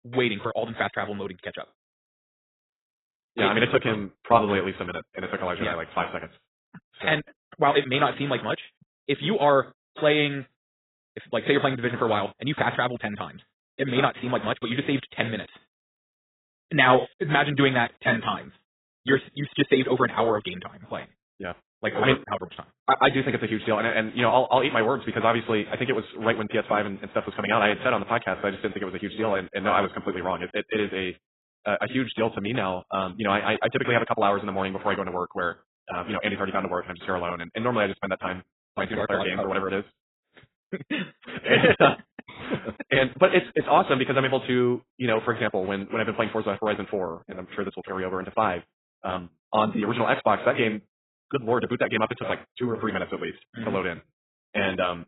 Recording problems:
garbled, watery; badly; nothing above 4 kHz
wrong speed, natural pitch; too fast; 1.5 times normal speed

